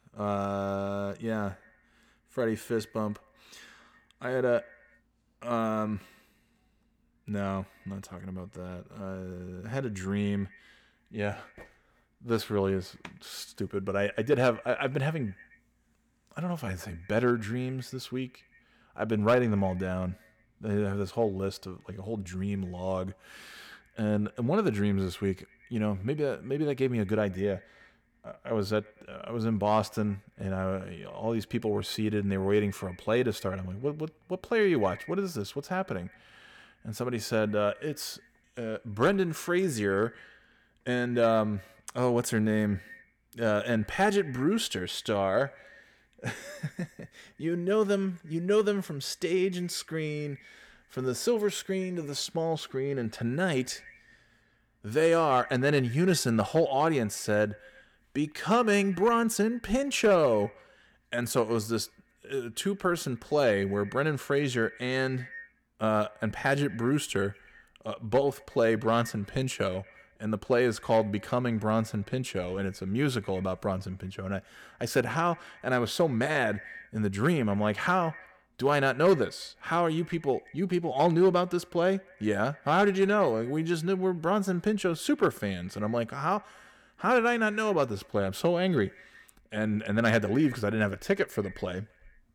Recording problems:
echo of what is said; faint; throughout; 120 ms later, 25 dB below the speech

